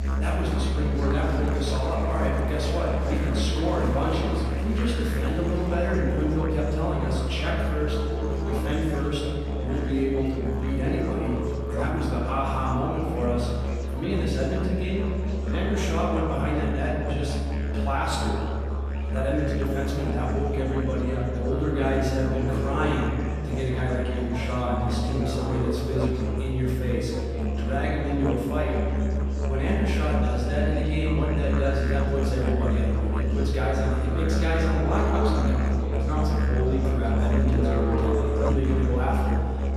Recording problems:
off-mic speech; far
room echo; noticeable; dies away in 2 s
background music; very loud; throughout; 1 dB above the speech
murmuring crowd; noticeable; throughout; 15 dB below the speech

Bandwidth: 14 kHz